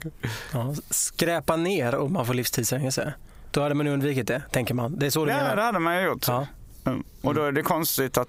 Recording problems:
squashed, flat; heavily

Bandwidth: 15.5 kHz